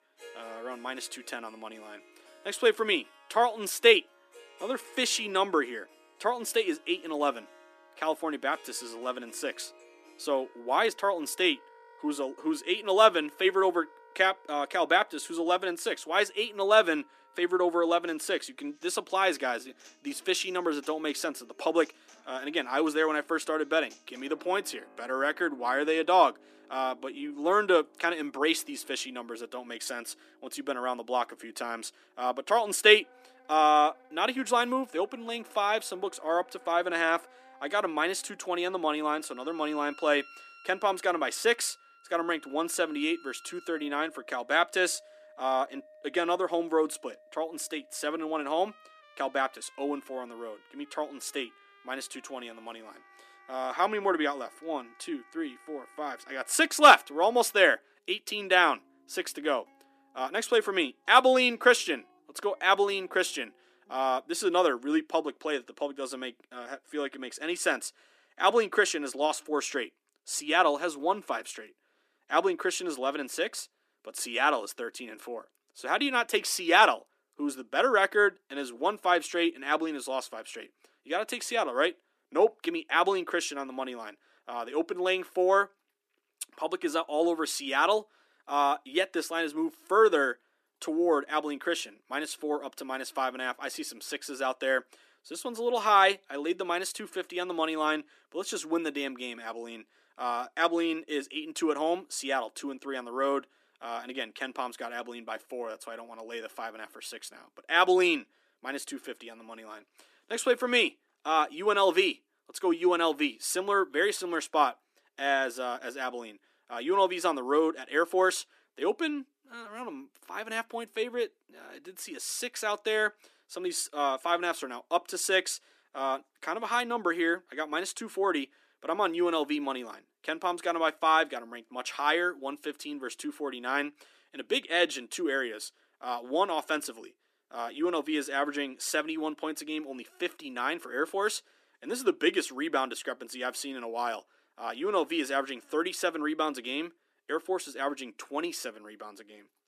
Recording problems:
thin; somewhat; fading below 250 Hz
background music; faint; until 1:05; 25 dB below the speech

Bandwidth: 14.5 kHz